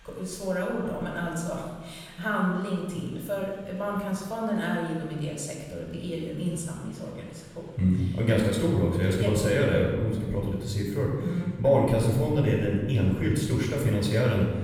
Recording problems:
off-mic speech; far
room echo; noticeable; dies away in 1.2 s
murmuring crowd; faint; throughout; 30 dB below the speech

